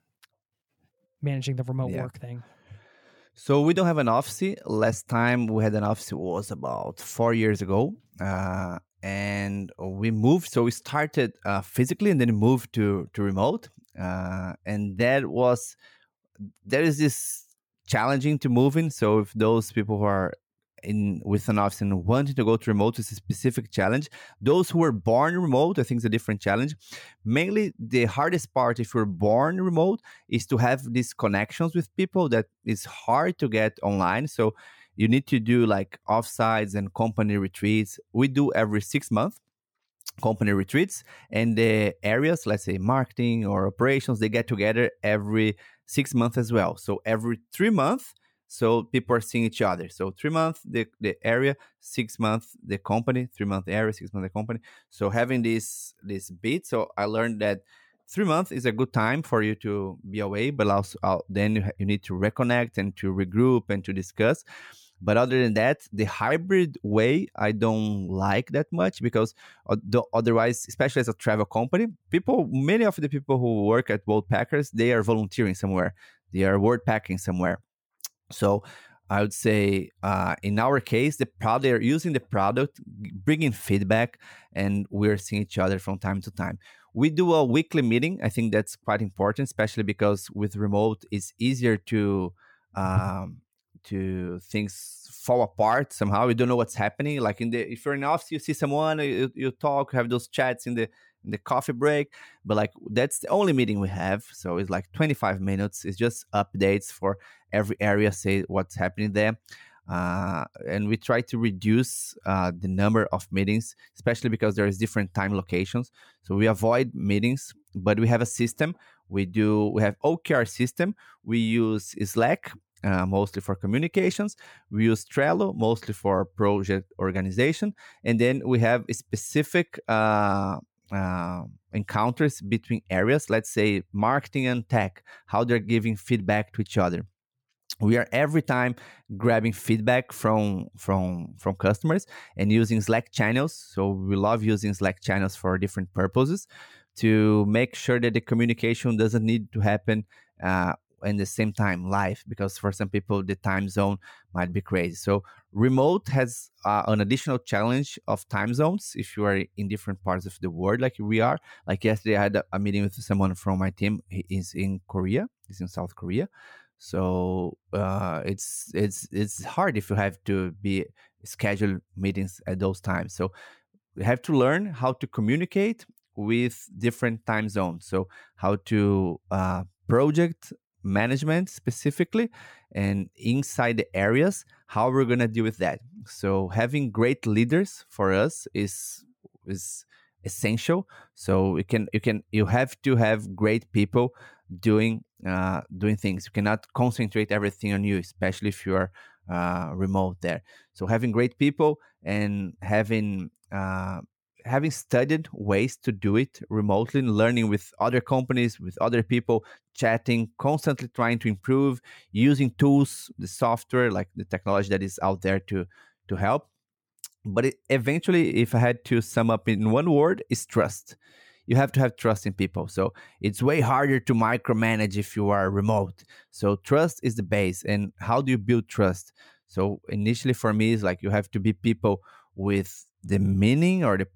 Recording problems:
none

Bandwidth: 18 kHz